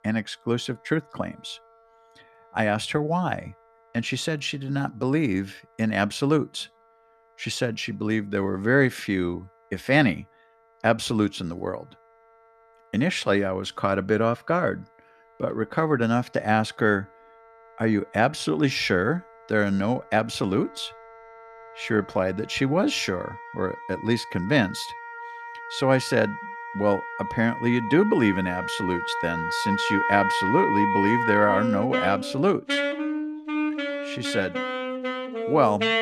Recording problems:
background music; loud; throughout; 4 dB below the speech

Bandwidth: 14 kHz